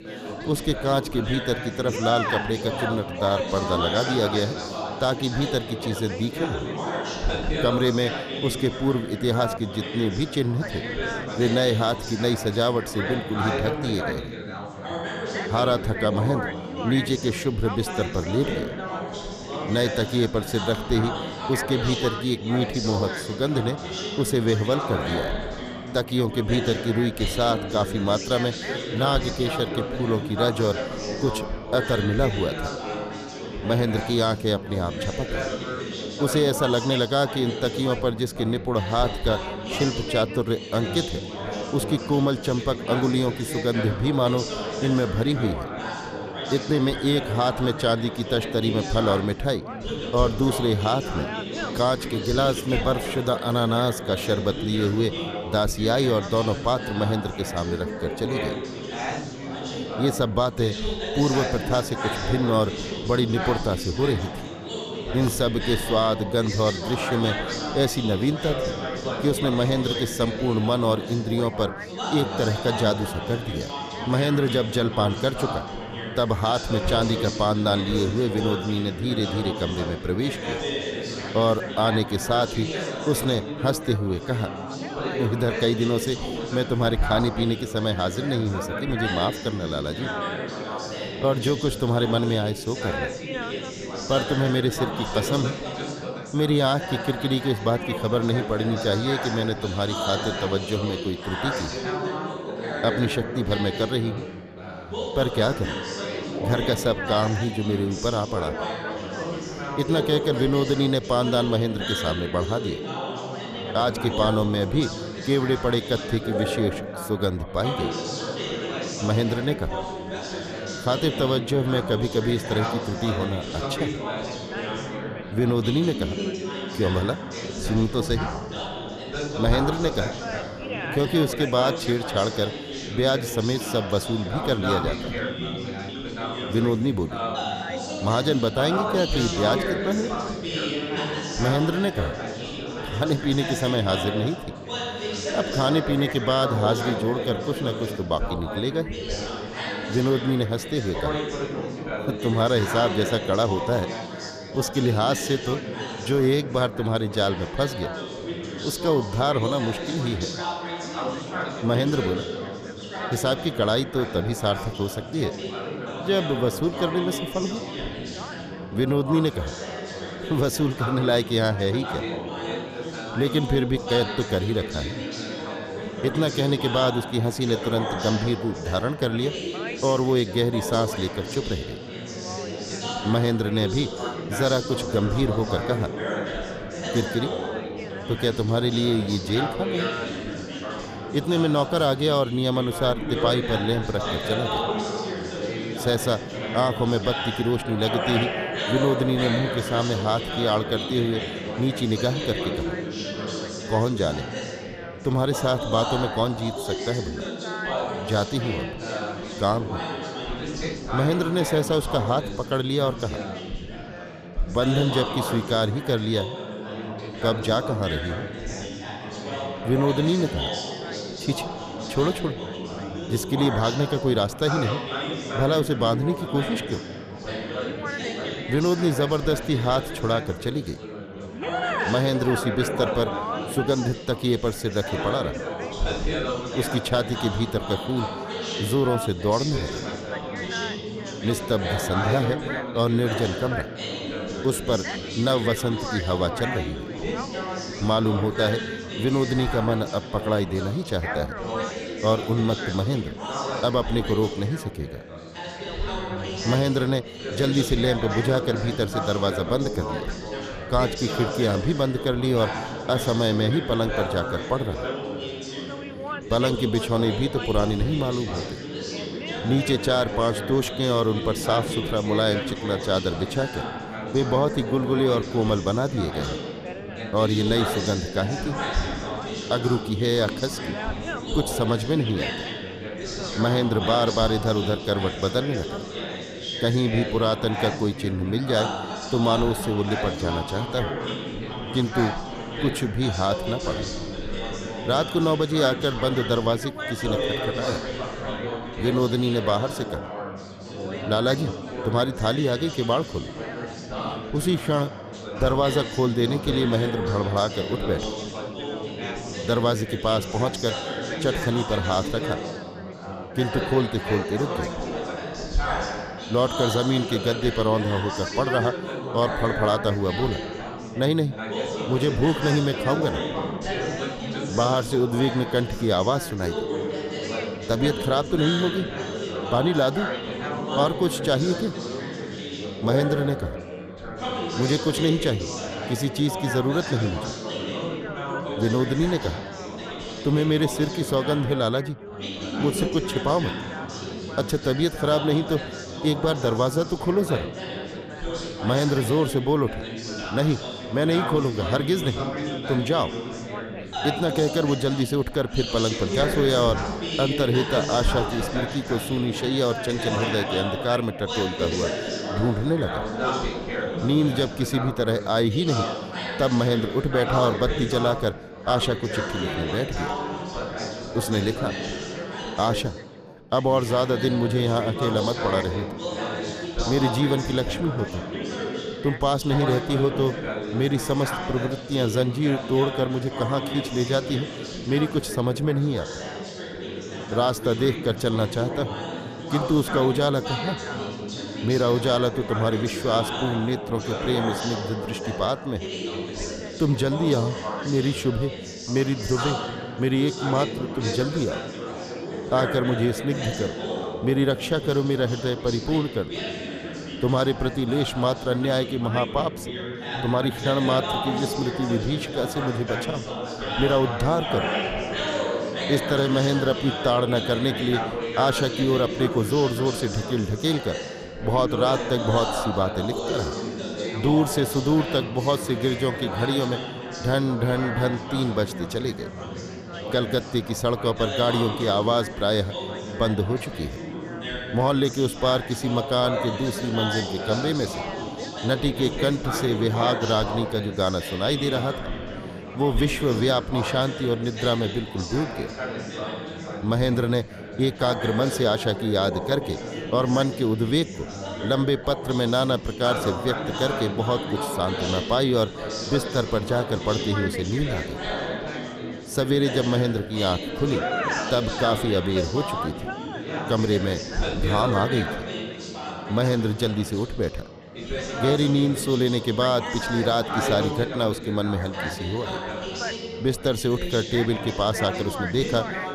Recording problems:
background chatter; loud; throughout; 4 voices, 6 dB below the speech

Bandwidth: 14.5 kHz